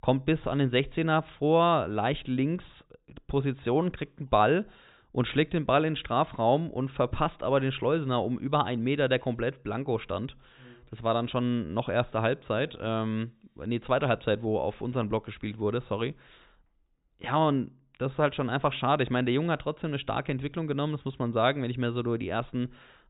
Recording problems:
high frequencies cut off; severe; nothing above 4 kHz

